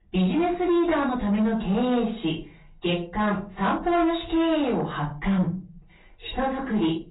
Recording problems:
off-mic speech; far
garbled, watery; badly; nothing above 3.5 kHz
room echo; slight; dies away in 0.3 s
distortion; slight; 10 dB below the speech

